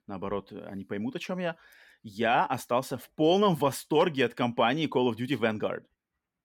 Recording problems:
none

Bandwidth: 17.5 kHz